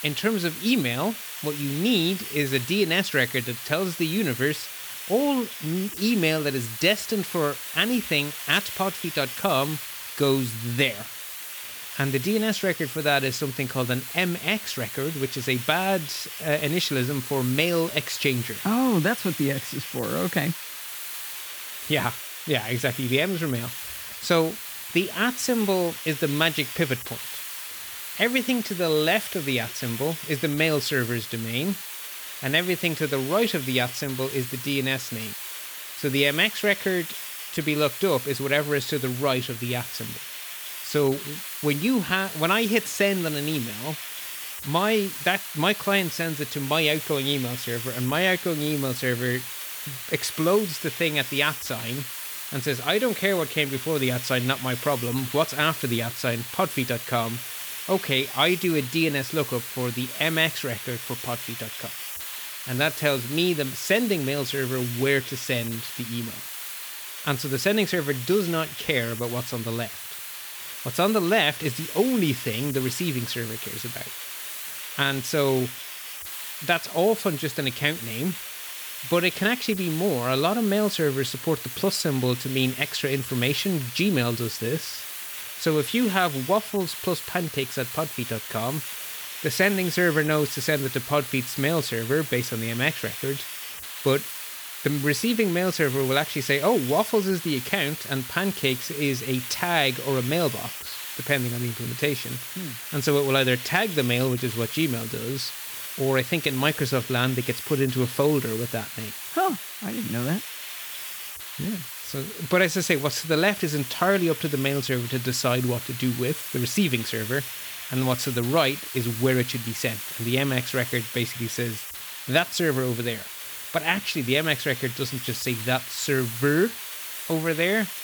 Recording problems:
hiss; loud; throughout; 8 dB below the speech

